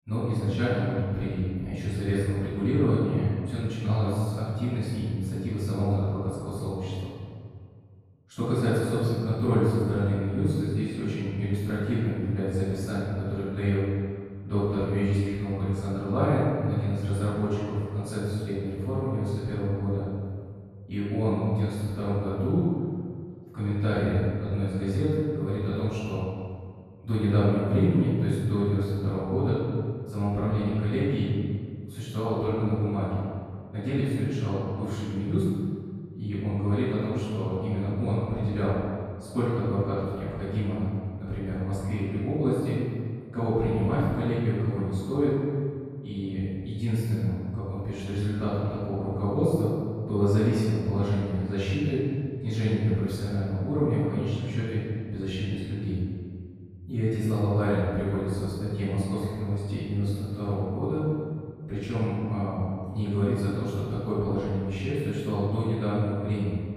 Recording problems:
room echo; strong; dies away in 1.8 s
off-mic speech; far

